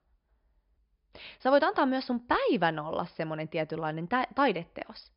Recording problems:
high frequencies cut off; noticeable; nothing above 5.5 kHz

